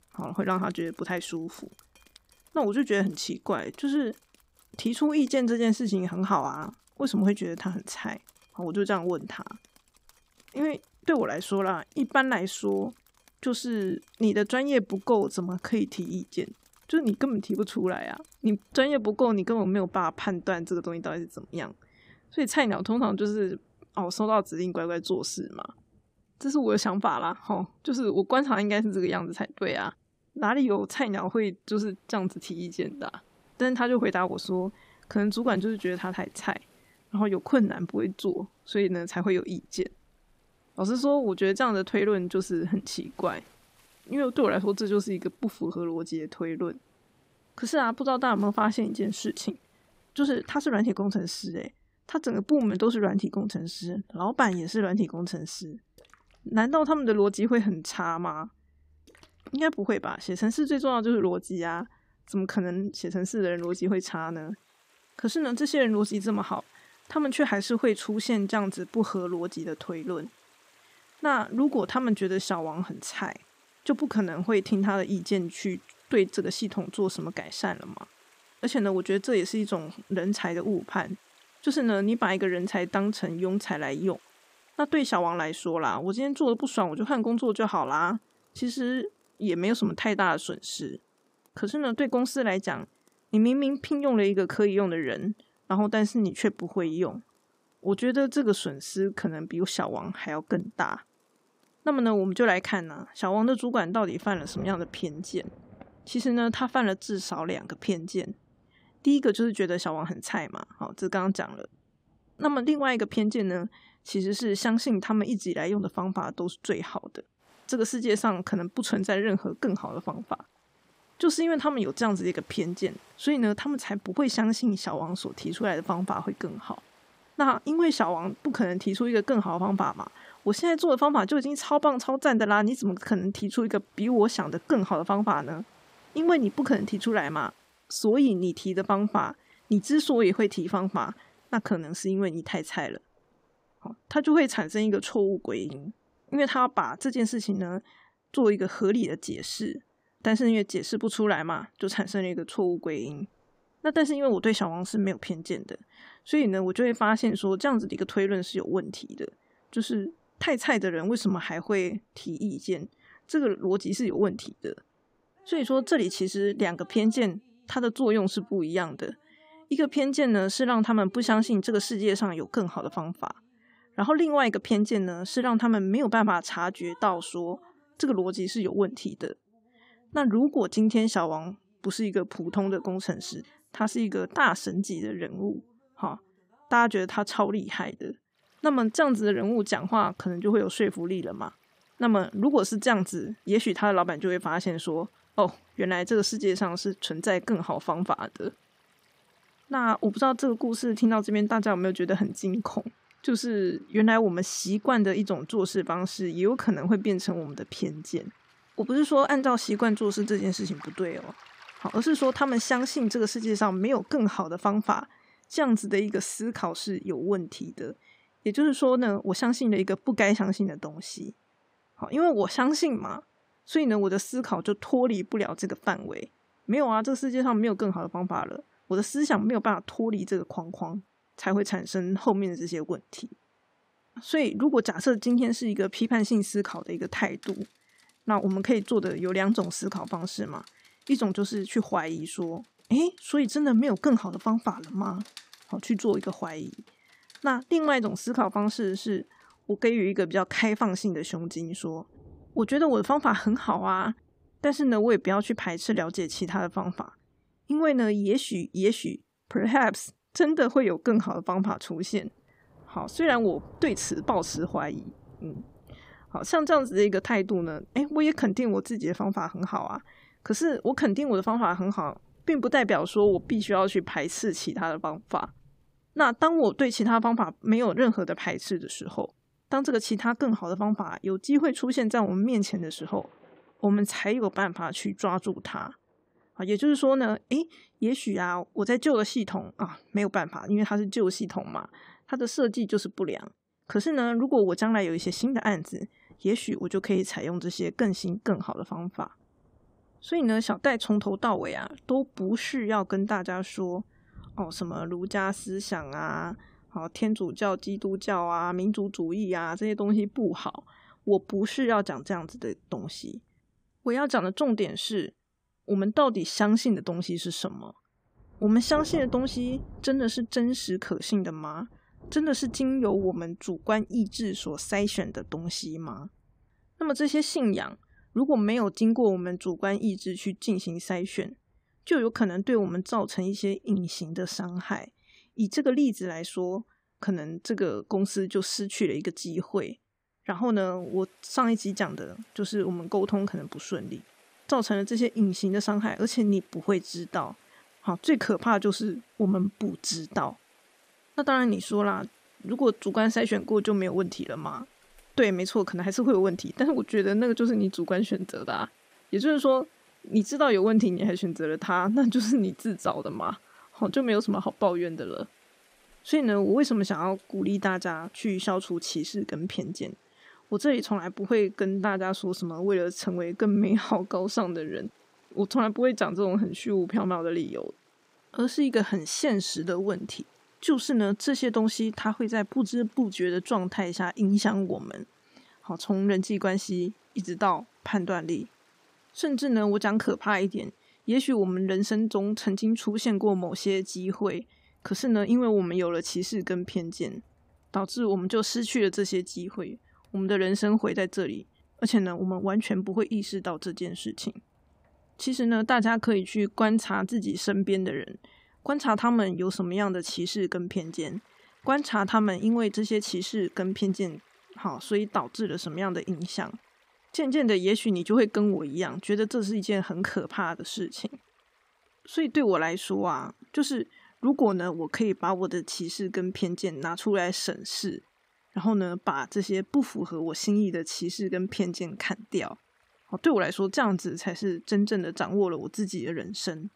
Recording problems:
rain or running water; faint; throughout; 30 dB below the speech

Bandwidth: 15.5 kHz